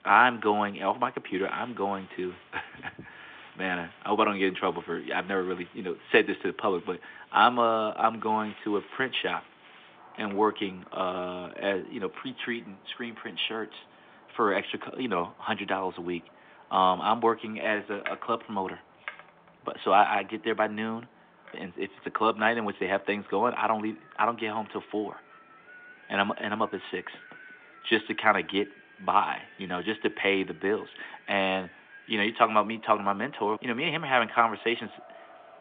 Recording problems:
phone-call audio
wind in the background; faint; throughout; 25 dB below the speech

